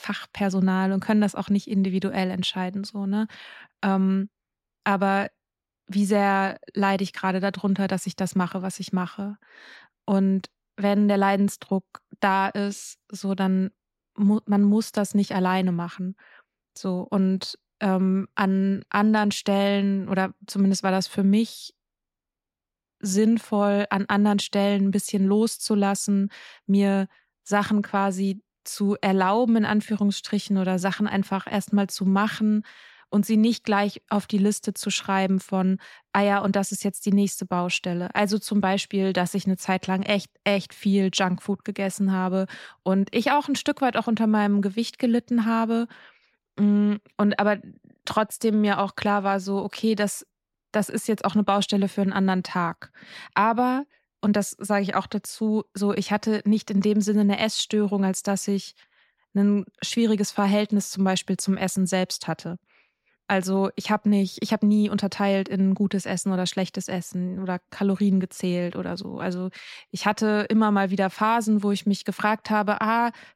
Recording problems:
none

